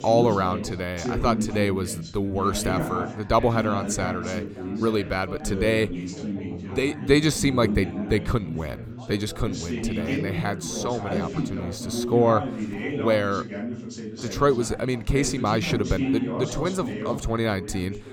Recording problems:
background chatter; loud; throughout; 3 voices, 6 dB below the speech

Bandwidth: 17.5 kHz